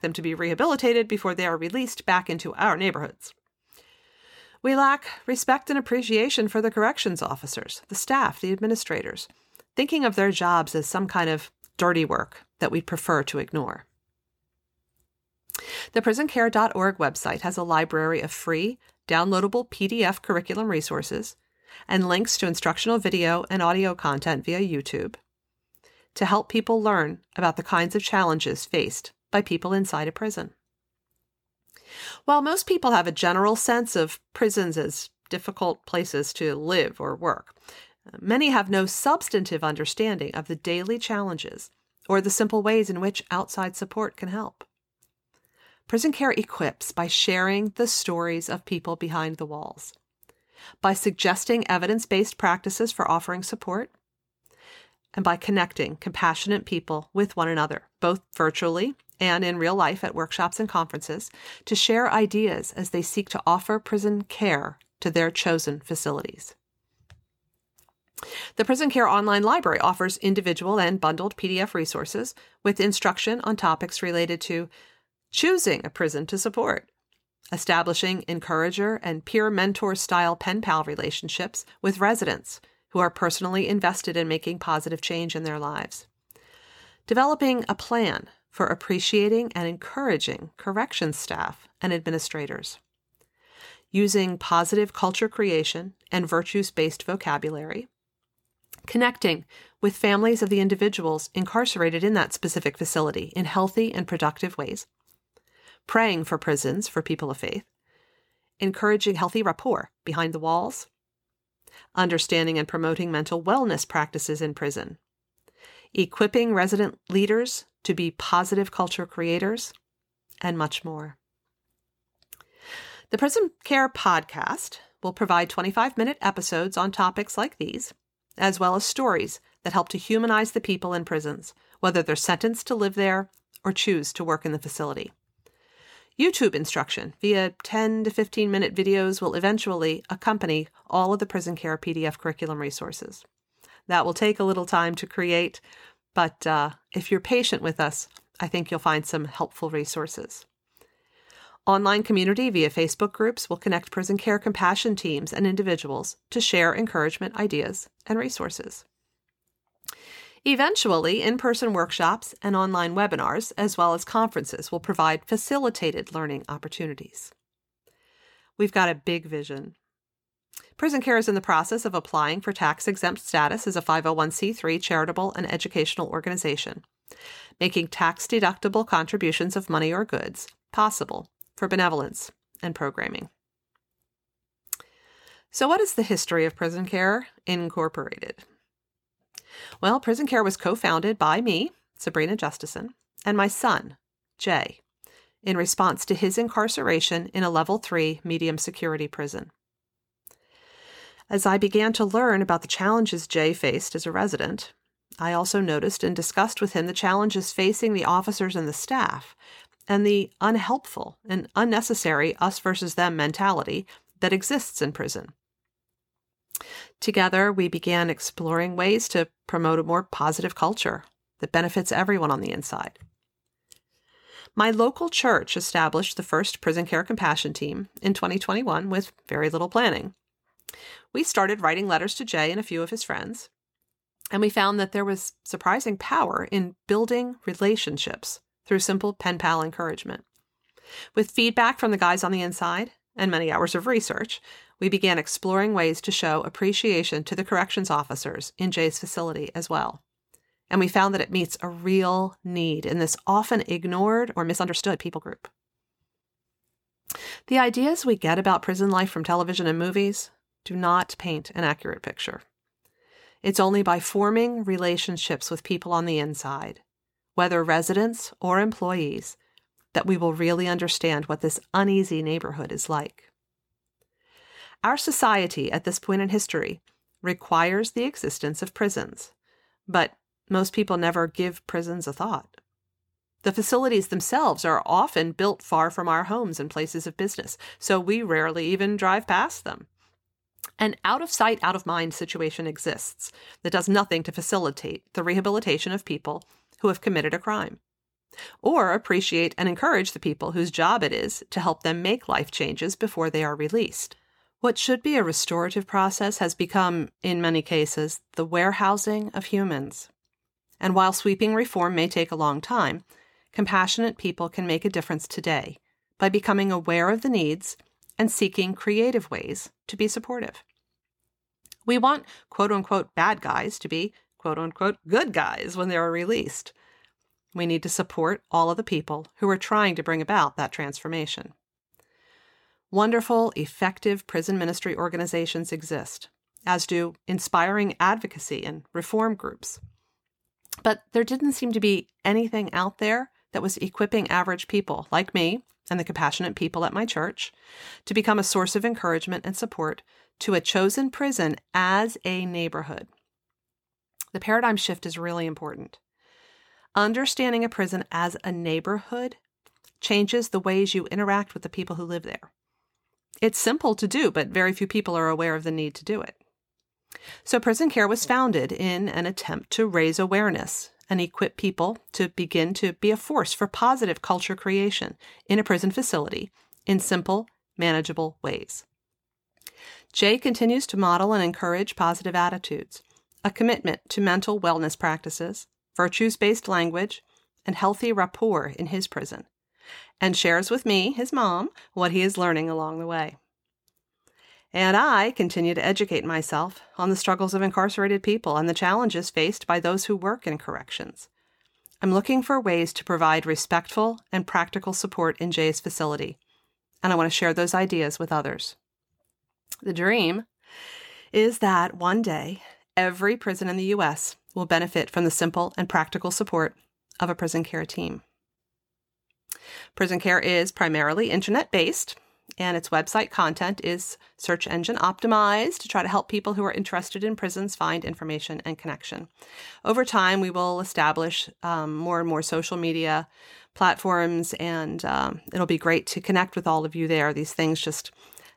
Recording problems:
uneven, jittery; strongly; from 1:45 to 4:54

